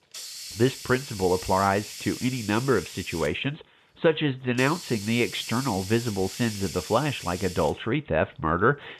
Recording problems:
high frequencies cut off; severe; nothing above 3.5 kHz
hiss; noticeable; throughout; 10 dB below the speech

